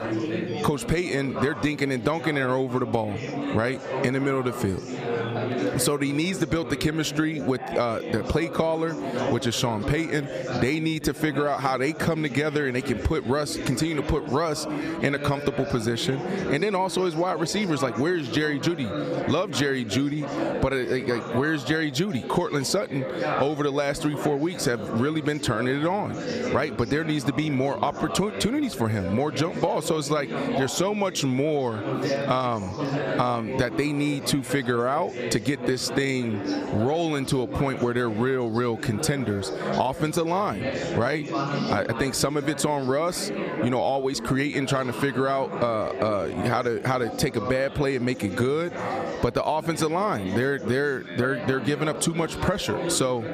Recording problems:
squashed, flat; somewhat, background pumping
chatter from many people; loud; throughout; 7 dB below the speech

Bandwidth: 14.5 kHz